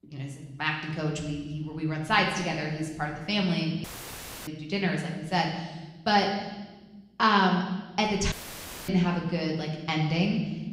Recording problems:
room echo; noticeable; dies away in 1.2 s
off-mic speech; somewhat distant
audio cutting out; filled with static; at 4 s for 0.5 s and at 8.5 s for 0.5 s

